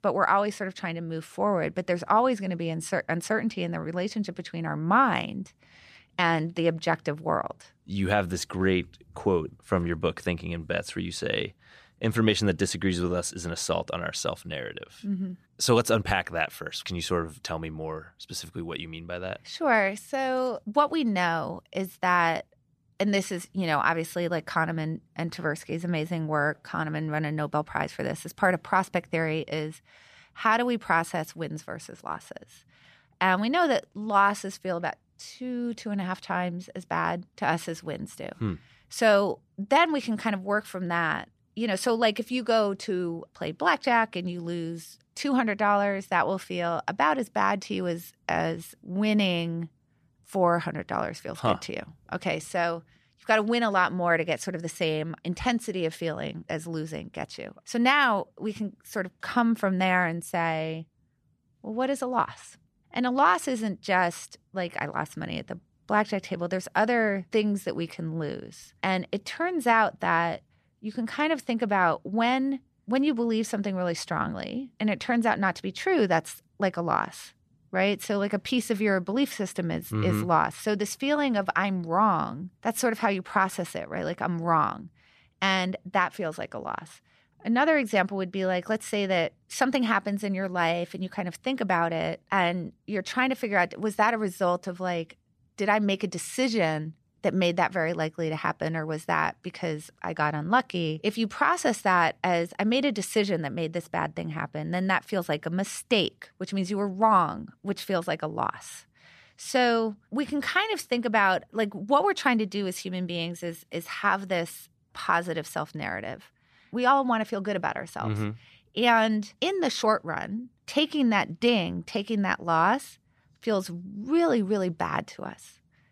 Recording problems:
none

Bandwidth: 14.5 kHz